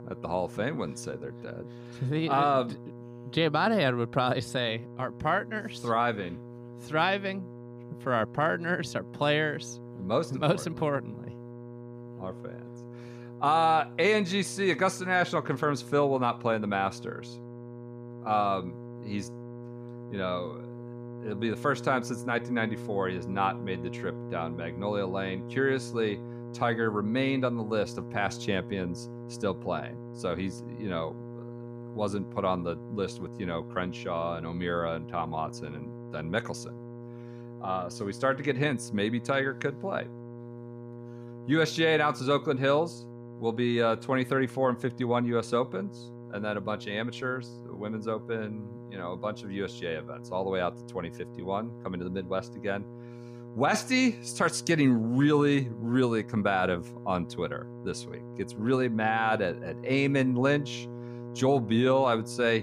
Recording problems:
electrical hum; noticeable; throughout; 60 Hz, 20 dB below the speech
abrupt cut into speech; at the end

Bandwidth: 15 kHz